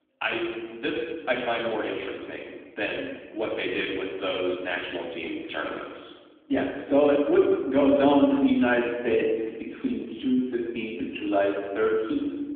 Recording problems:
room echo; noticeable; dies away in 1.4 s
phone-call audio; nothing above 3.5 kHz
off-mic speech; somewhat distant

